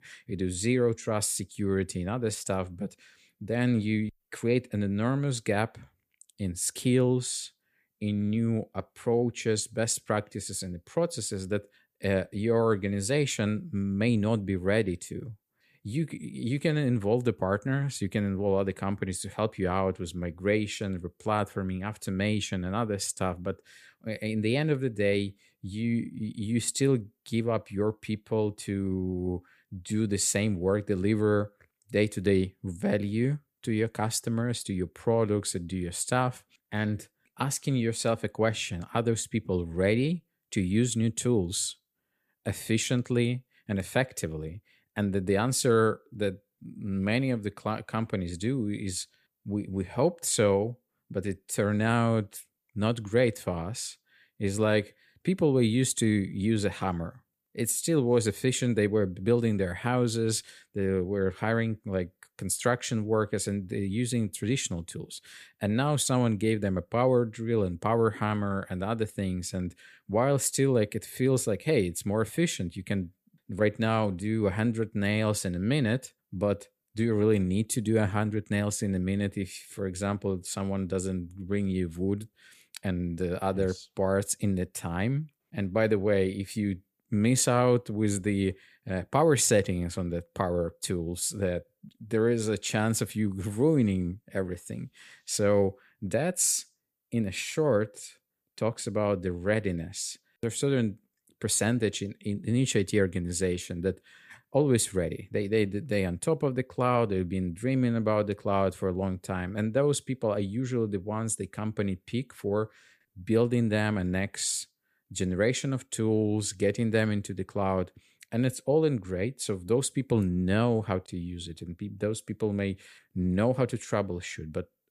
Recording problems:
none

